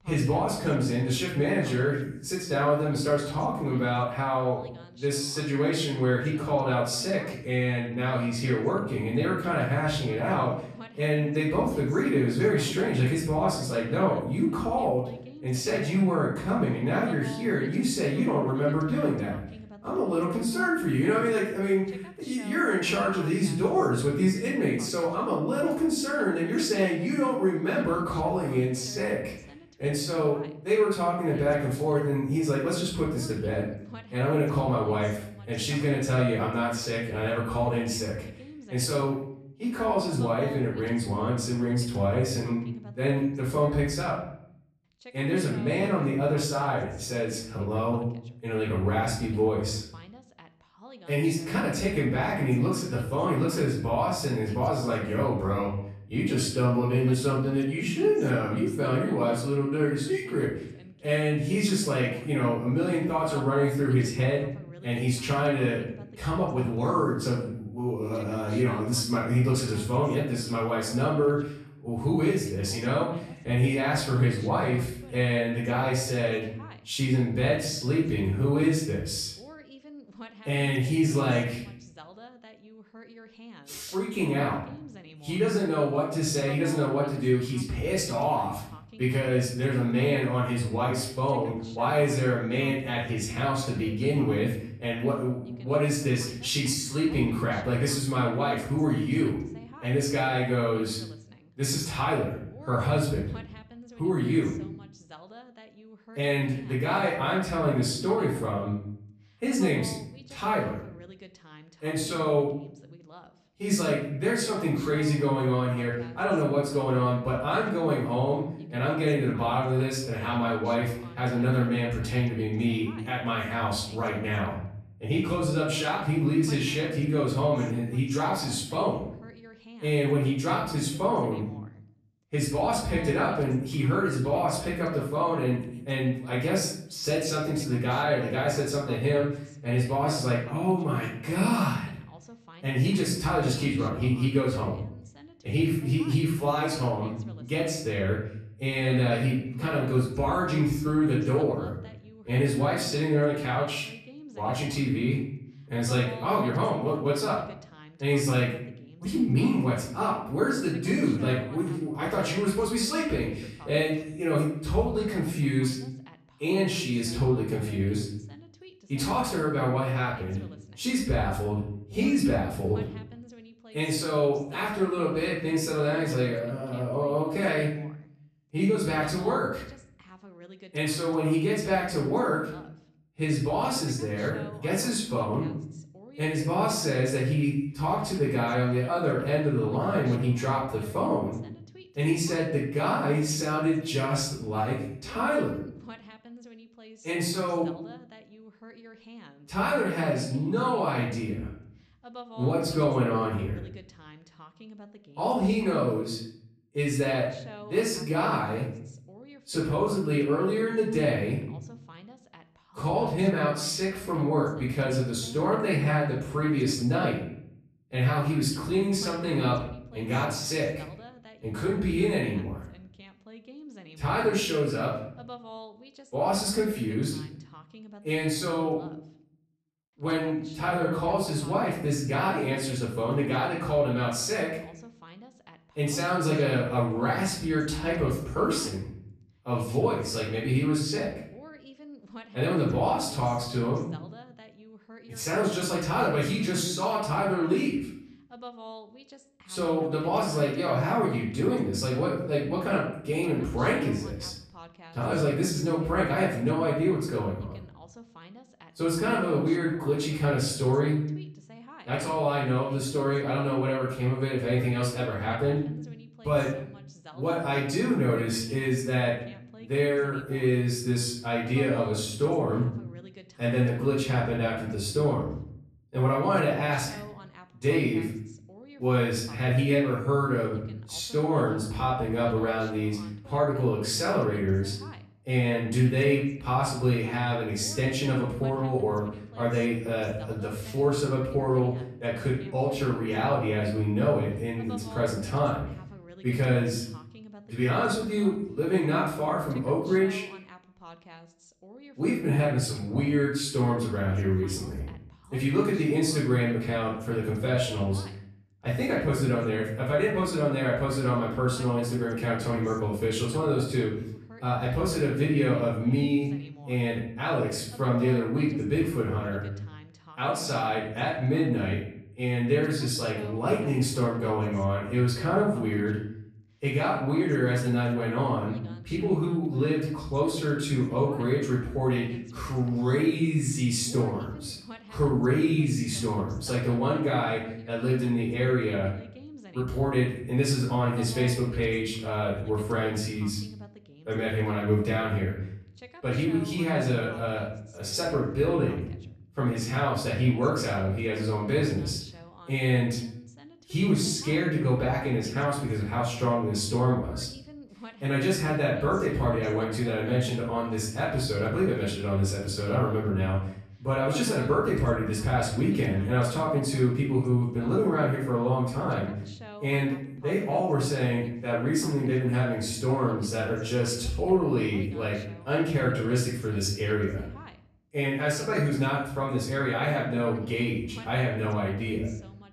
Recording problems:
off-mic speech; far
room echo; noticeable; dies away in 0.6 s
voice in the background; faint; throughout; 20 dB below the speech

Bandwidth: 13.5 kHz